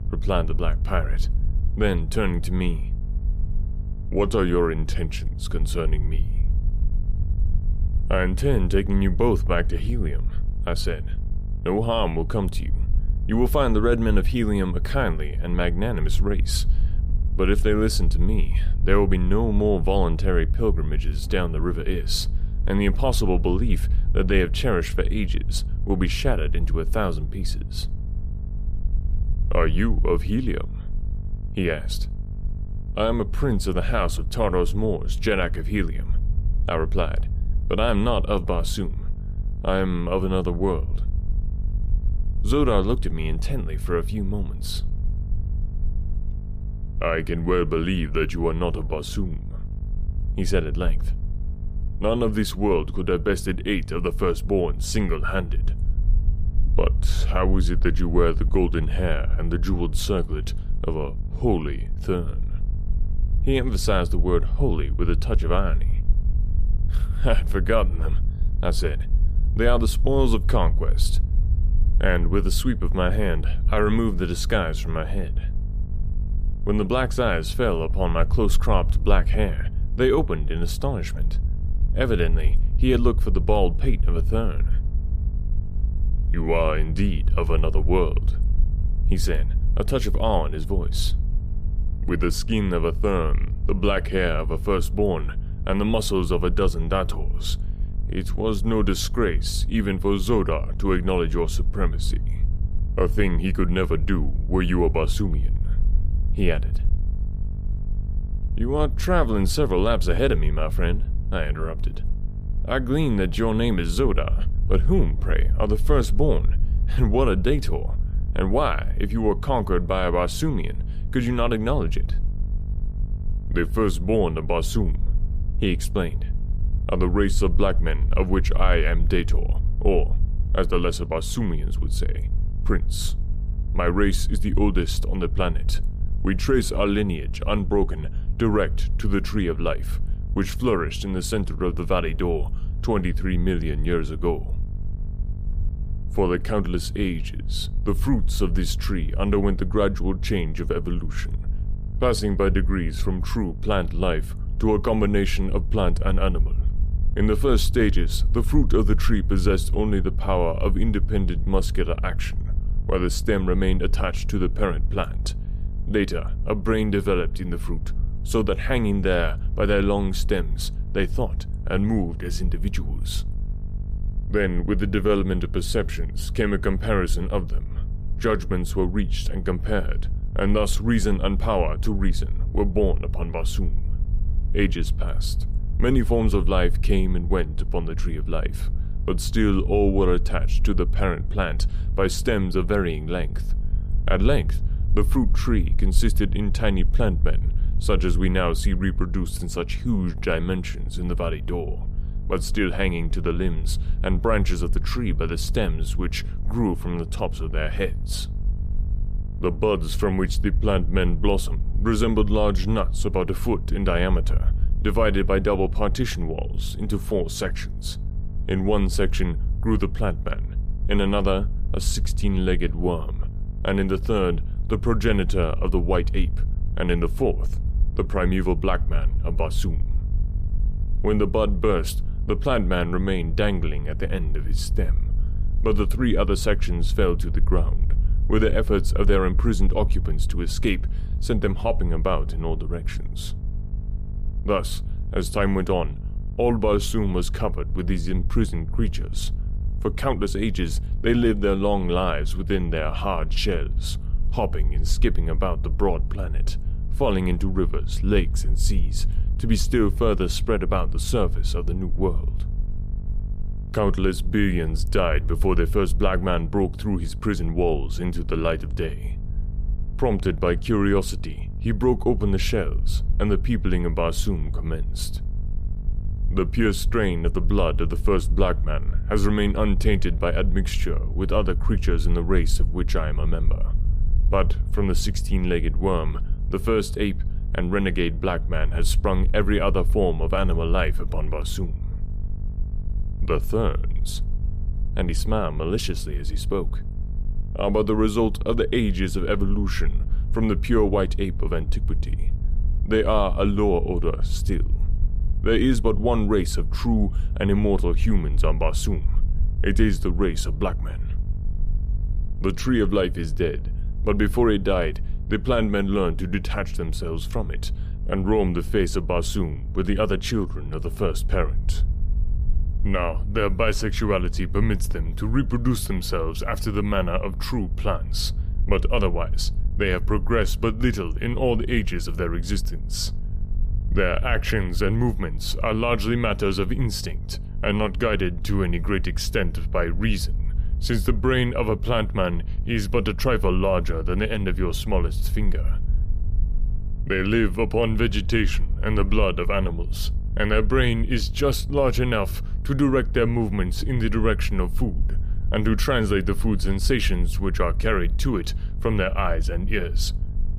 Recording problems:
electrical hum; faint; throughout; 50 Hz, 20 dB below the speech
low rumble; faint; throughout; 20 dB below the speech

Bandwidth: 14.5 kHz